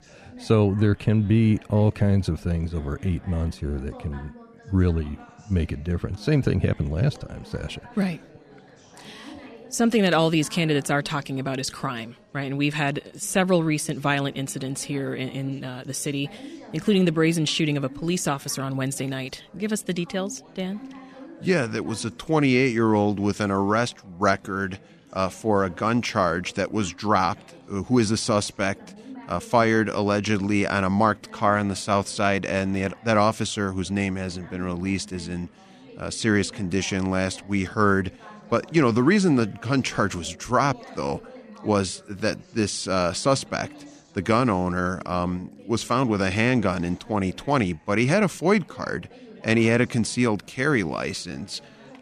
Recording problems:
background chatter; faint; throughout; 4 voices, 25 dB below the speech

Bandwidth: 14.5 kHz